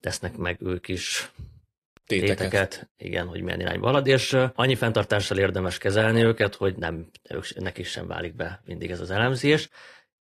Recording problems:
garbled, watery; slightly; nothing above 15 kHz

